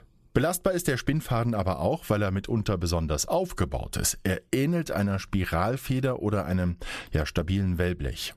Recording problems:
squashed, flat; somewhat

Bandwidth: 14 kHz